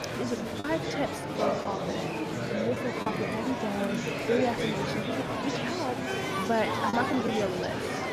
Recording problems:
murmuring crowd; very loud; throughout; 2 dB above the speech
choppy; occasionally; 3% of the speech affected

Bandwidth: 14.5 kHz